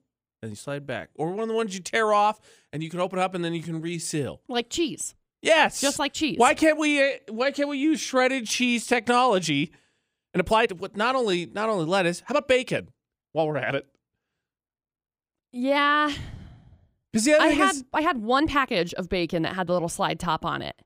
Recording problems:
uneven, jittery; strongly; from 0.5 to 20 s

